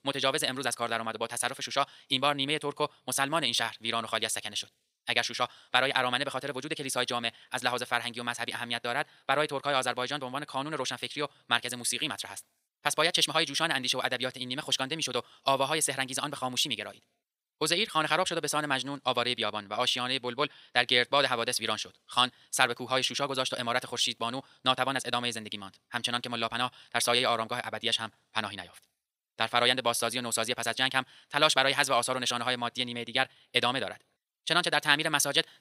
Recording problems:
wrong speed, natural pitch; too fast; 1.6 times normal speed
thin; somewhat; fading below 850 Hz

